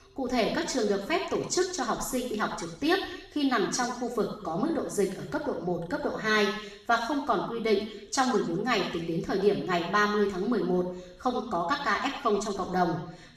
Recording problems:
off-mic speech; far
room echo; noticeable; dies away in 0.8 s

